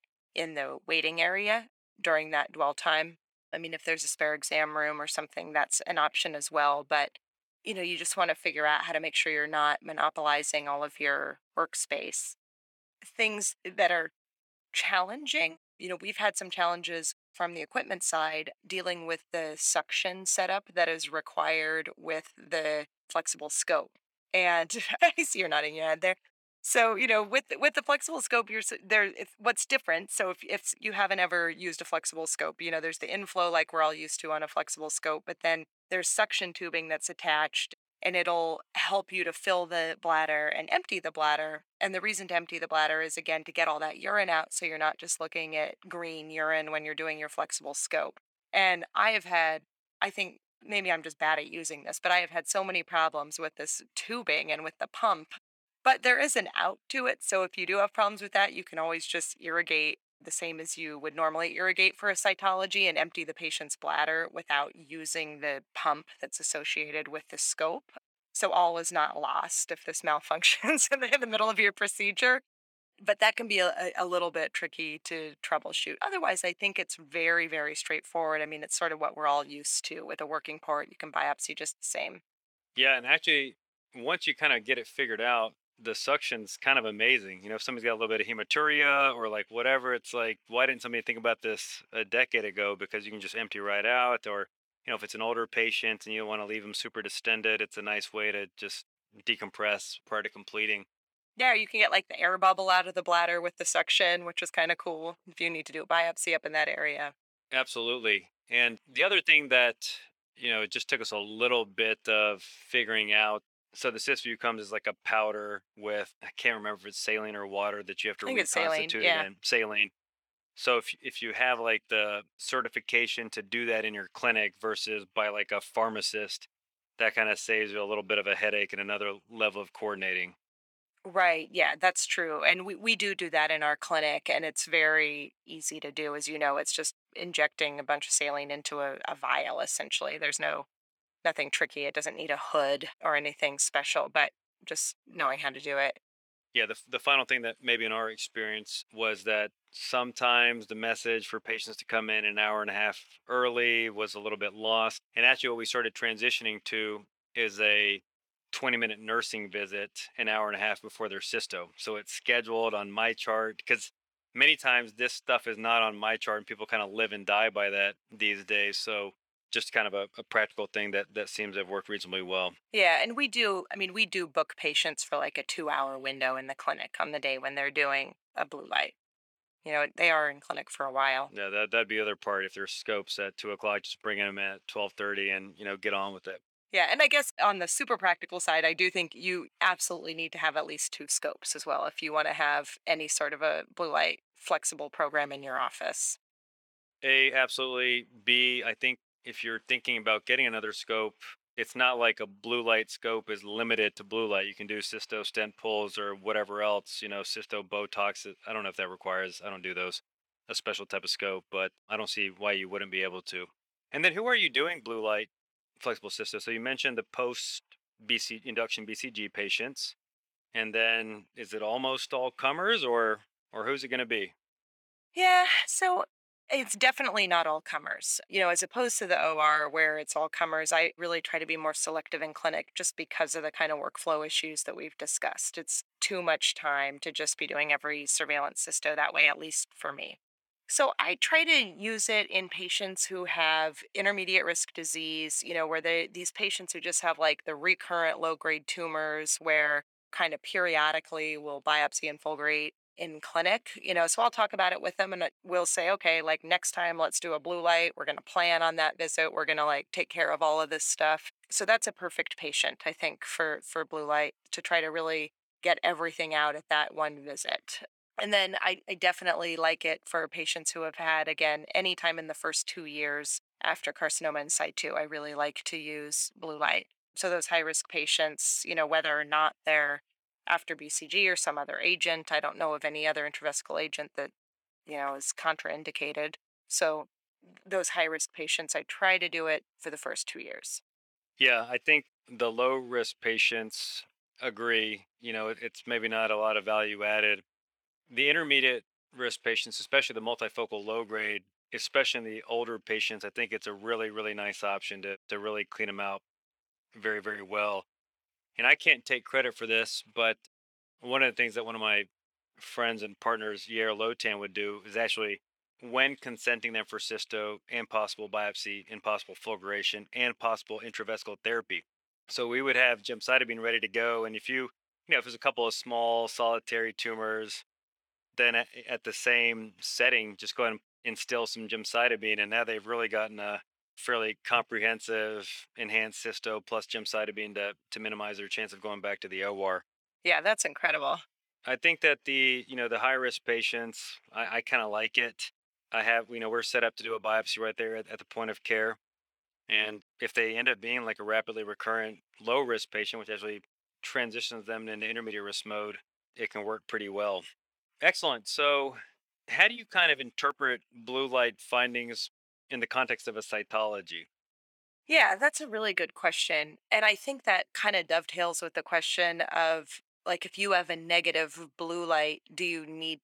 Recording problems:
thin; very; fading below 550 Hz

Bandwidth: 18.5 kHz